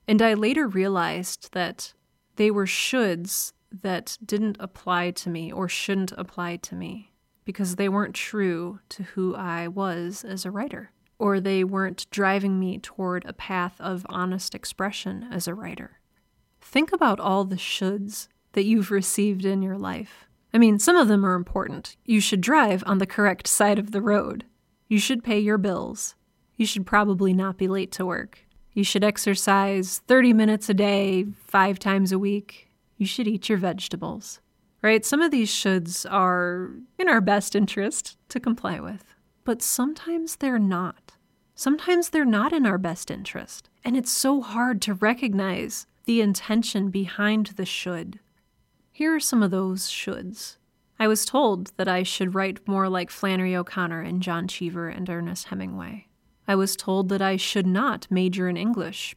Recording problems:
none

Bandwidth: 16 kHz